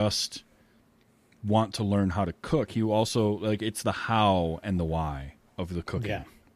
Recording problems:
abrupt cut into speech; at the start

